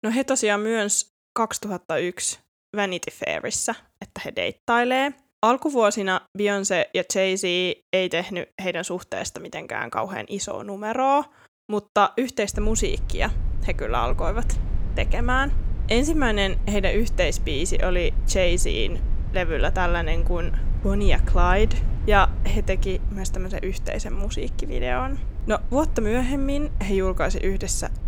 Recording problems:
low rumble; faint; from 13 s on; 20 dB below the speech

